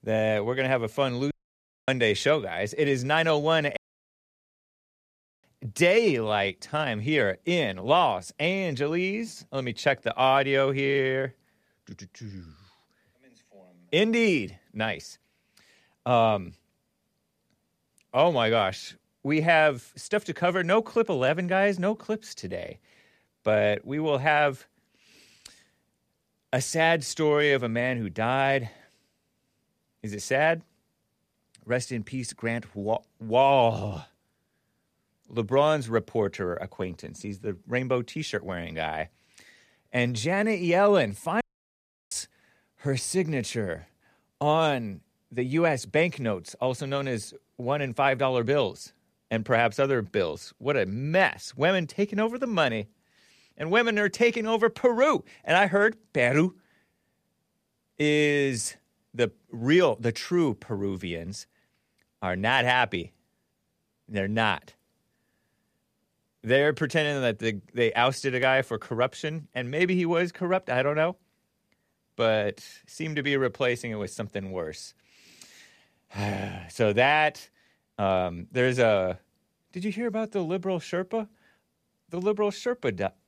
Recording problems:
audio cutting out; at 1.5 s for 0.5 s, at 4 s for 1.5 s and at 41 s for 0.5 s

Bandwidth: 14.5 kHz